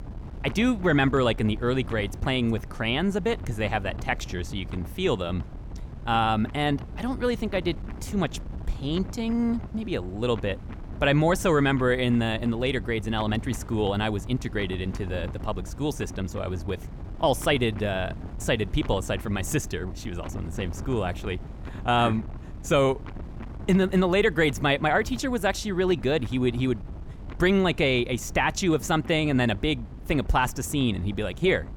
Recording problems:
wind noise on the microphone; occasional gusts; 20 dB below the speech

